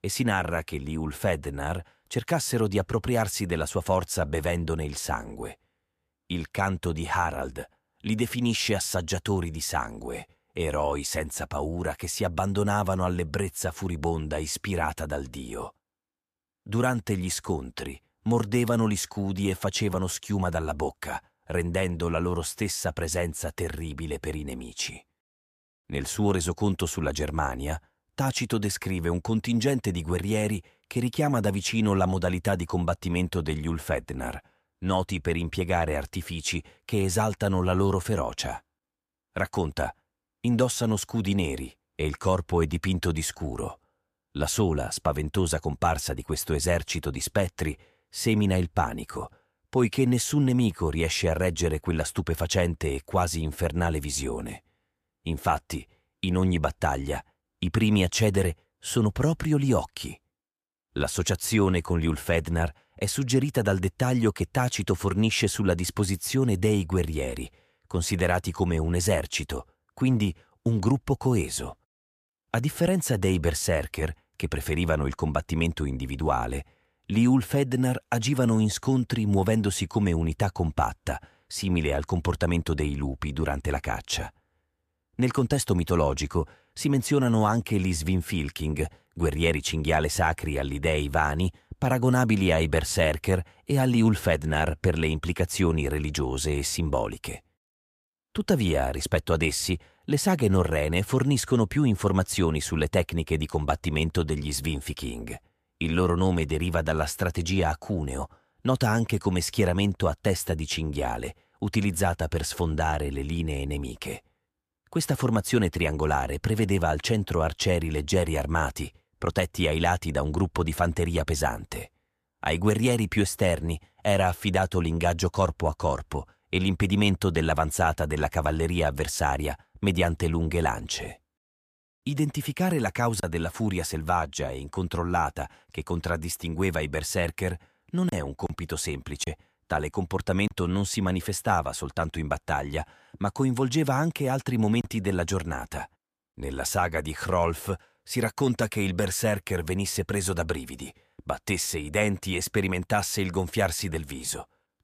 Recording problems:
none

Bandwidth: 14.5 kHz